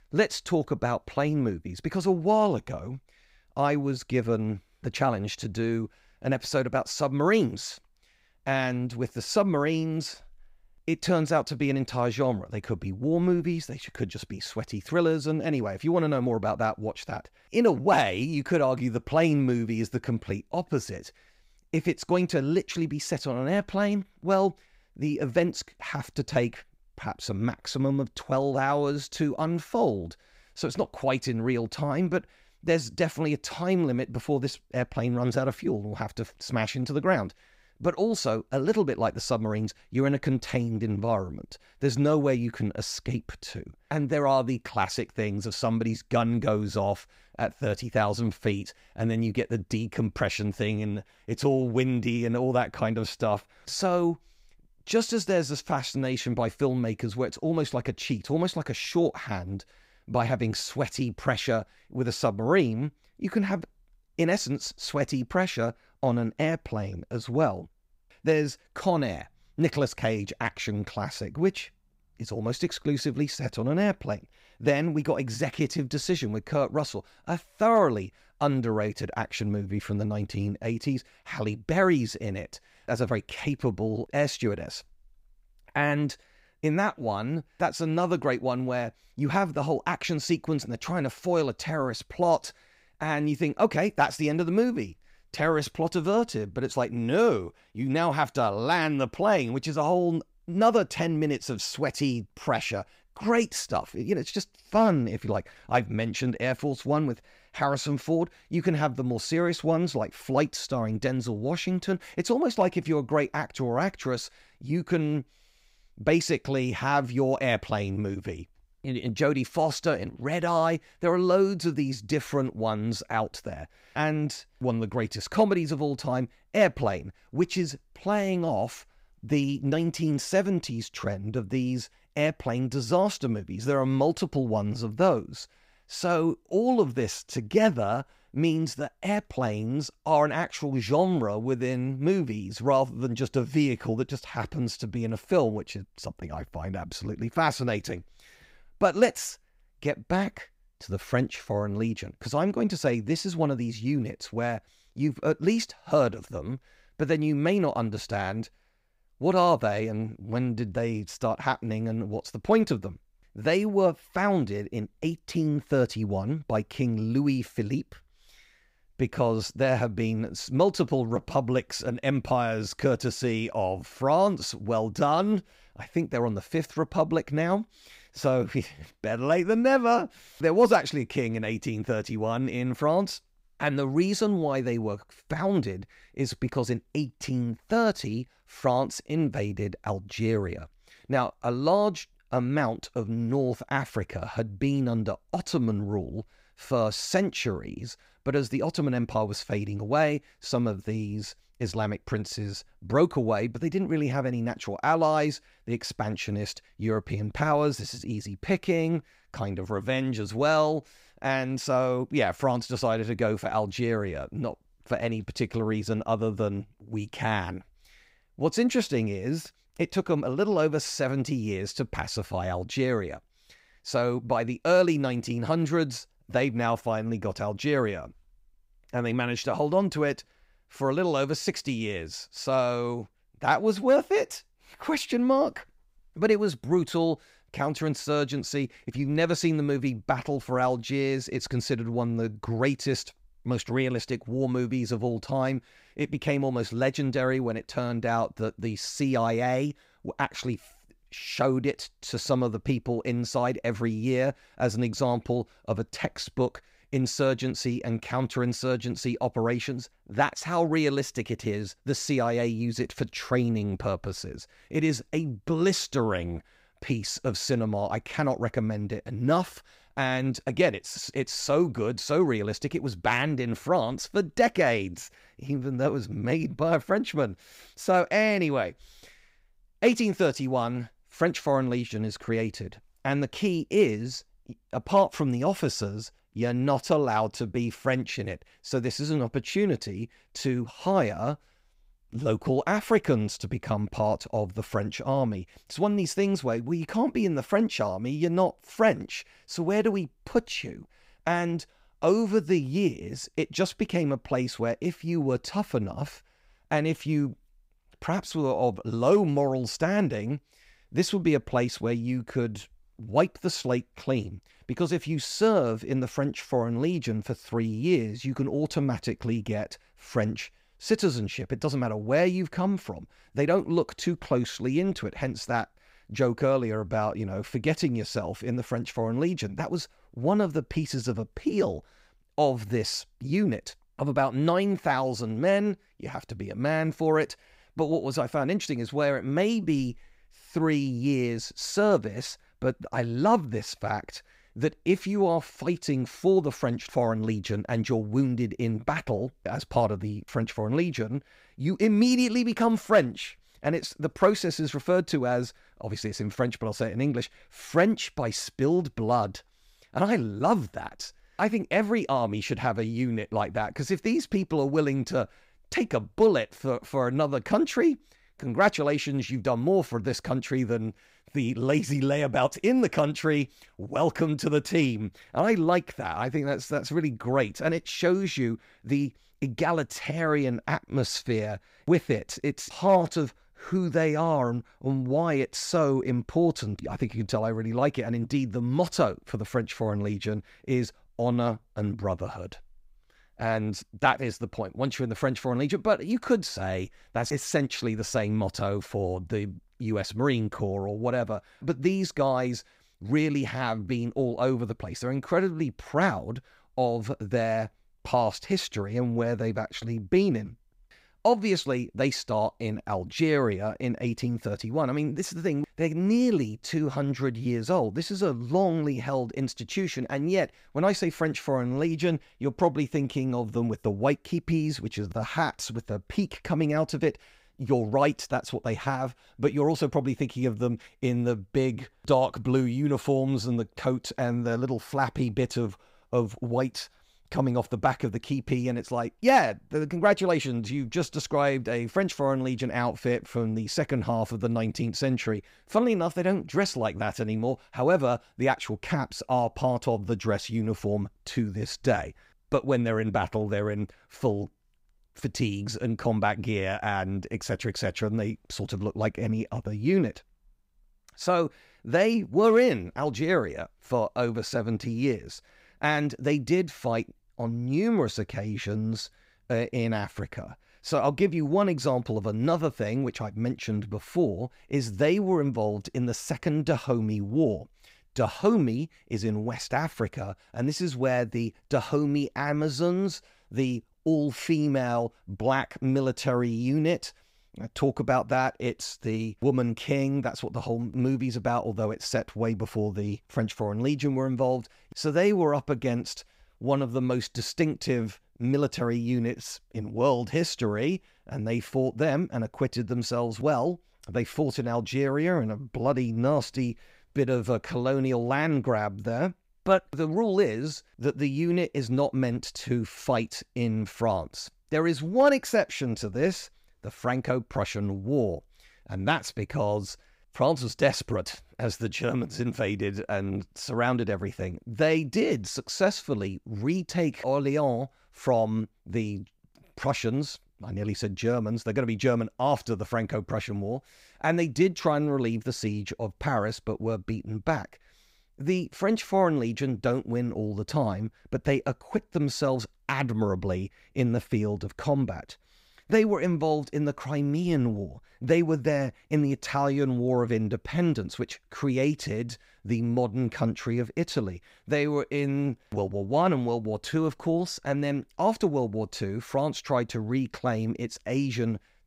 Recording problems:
none

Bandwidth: 15.5 kHz